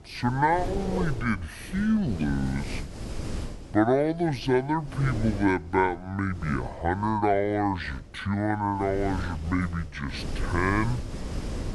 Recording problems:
wrong speed and pitch; too slow and too low; 0.6 times normal speed
wind noise on the microphone; occasional gusts; 15 dB below the speech

